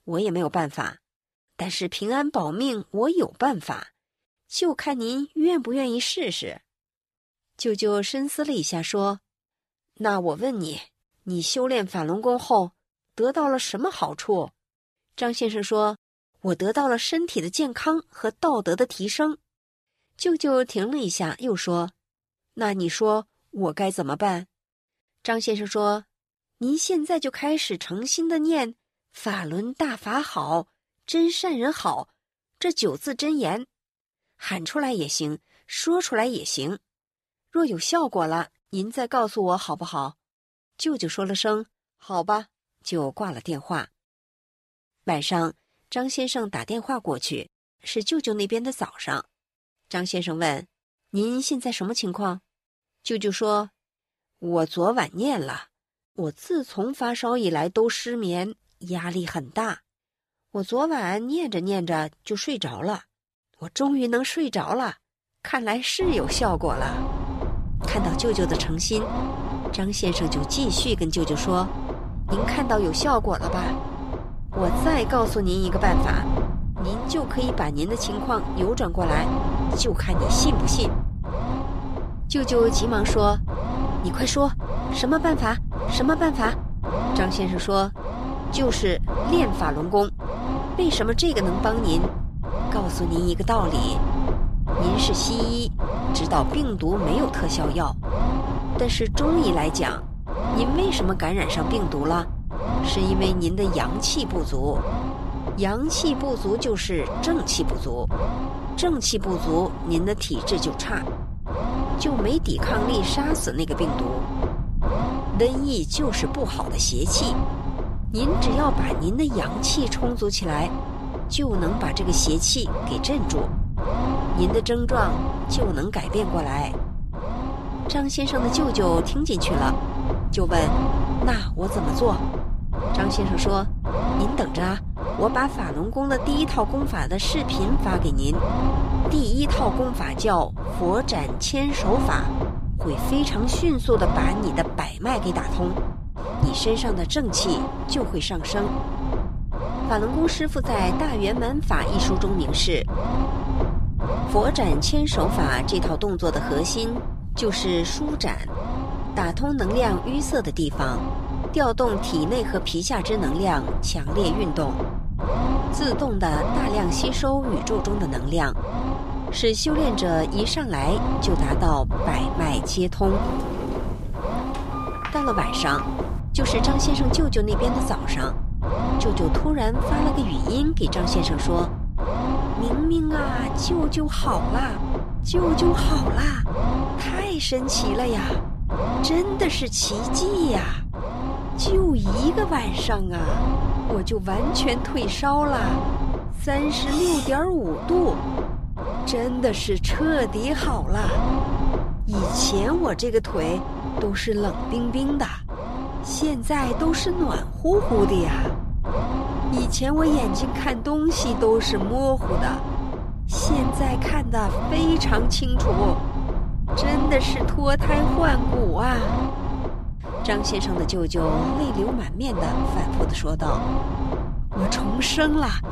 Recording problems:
low rumble; loud; from 1:06 on; 5 dB below the speech
door banging; noticeable; from 2:53 to 2:56; peak 3 dB below the speech
clattering dishes; noticeable; at 3:17; peak 4 dB below the speech

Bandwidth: 14.5 kHz